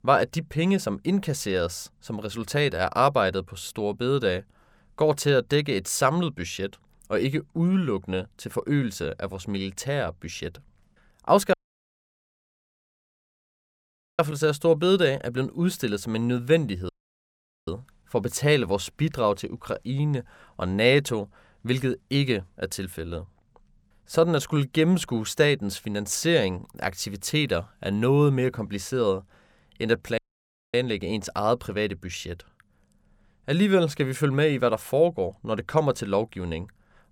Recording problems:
audio cutting out; at 12 s for 2.5 s, at 17 s for 1 s and at 30 s for 0.5 s

